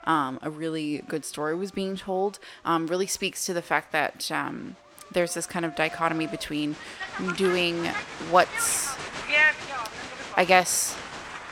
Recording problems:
crowd noise; loud; throughout; 3 dB below the speech

